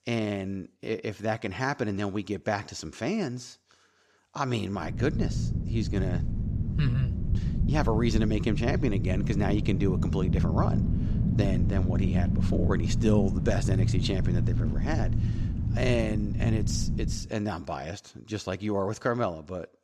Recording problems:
low rumble; loud; from 5 to 17 s; 7 dB below the speech

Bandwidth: 13.5 kHz